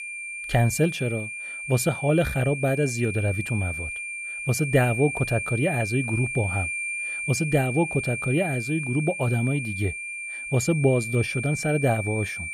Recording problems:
high-pitched whine; loud; throughout; 2.5 kHz, 5 dB below the speech

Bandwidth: 14.5 kHz